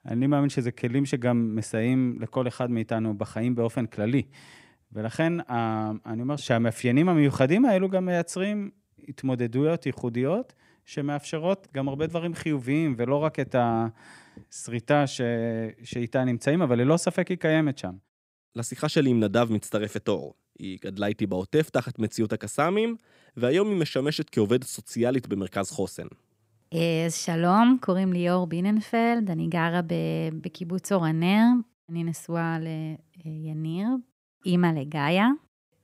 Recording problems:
none

